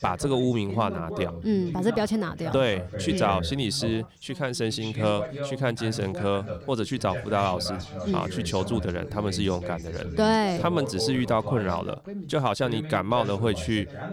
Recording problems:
background chatter; loud; throughout; 2 voices, 8 dB below the speech

